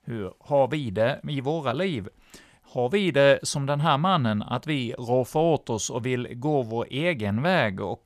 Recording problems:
none

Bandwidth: 14.5 kHz